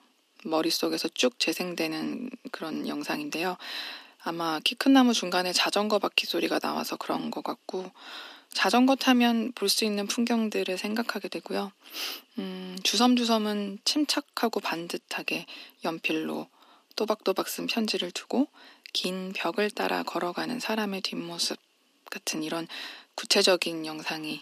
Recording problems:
thin; somewhat; fading below 300 Hz

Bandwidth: 14.5 kHz